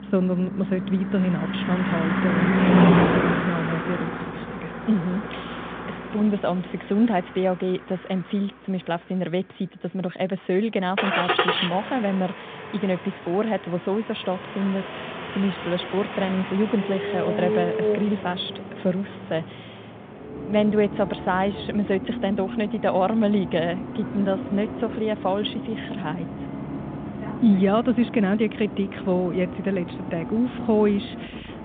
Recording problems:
phone-call audio; nothing above 3.5 kHz
traffic noise; loud; throughout; 3 dB below the speech

